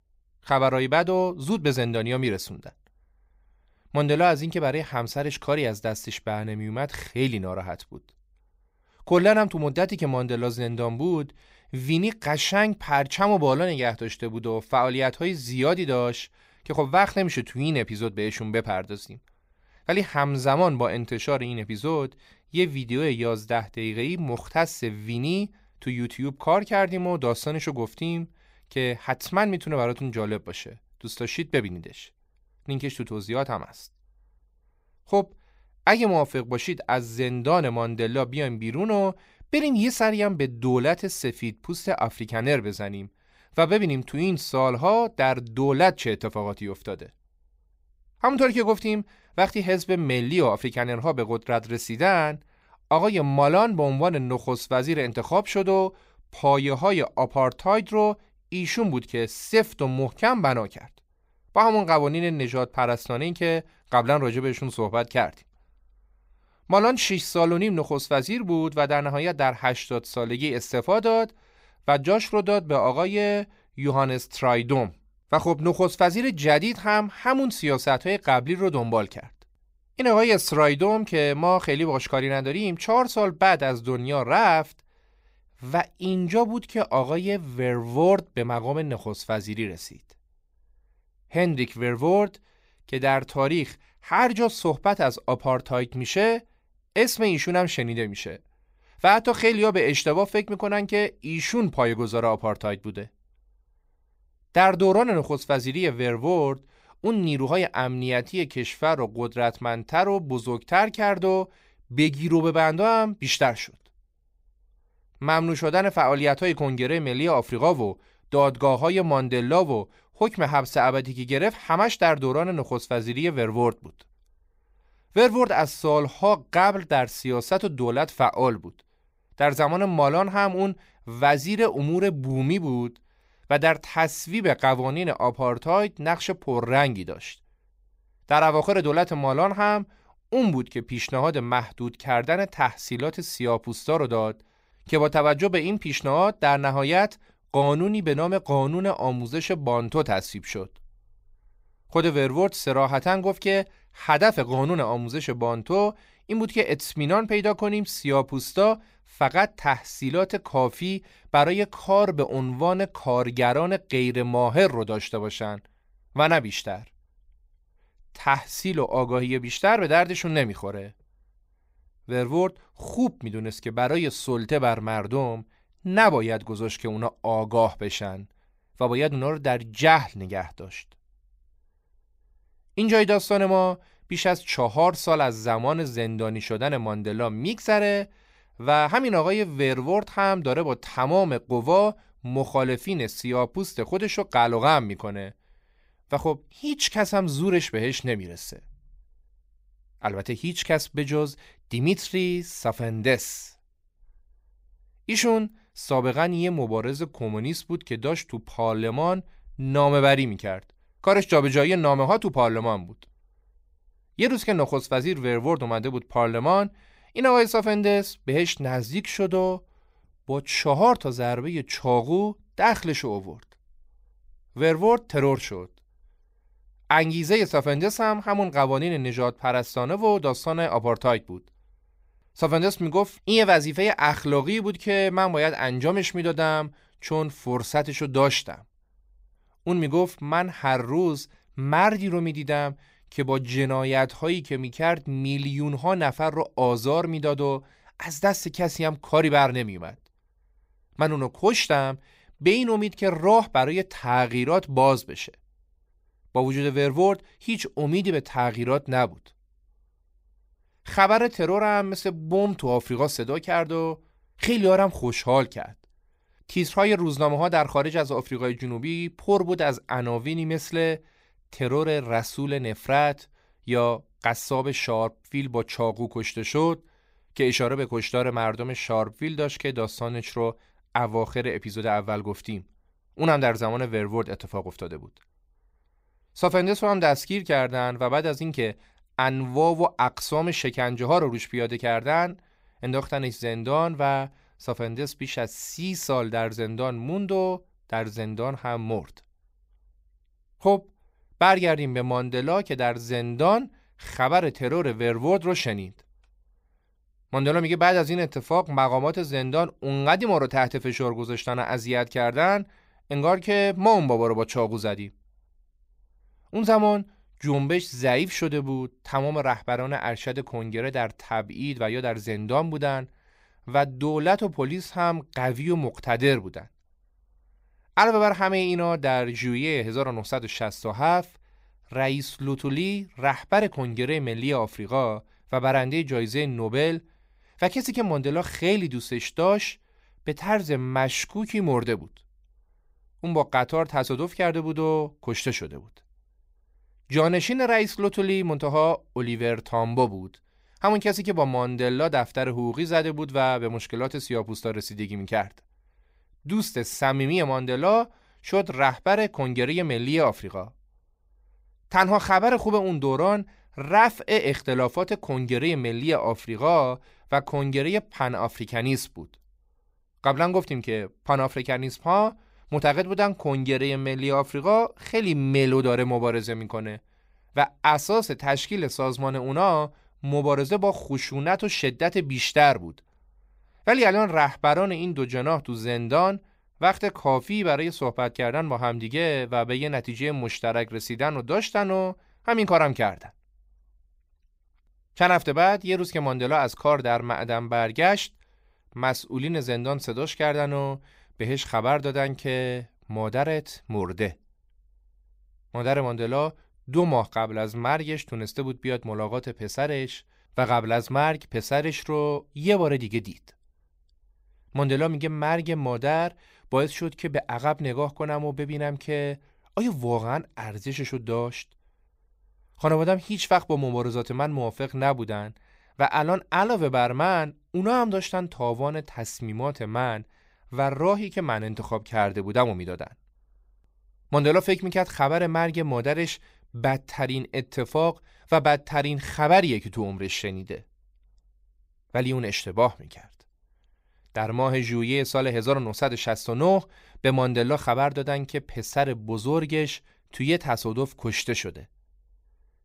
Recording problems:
none

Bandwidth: 15.5 kHz